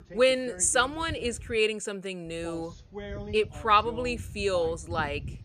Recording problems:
voice in the background; noticeable; throughout; 15 dB below the speech

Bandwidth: 14.5 kHz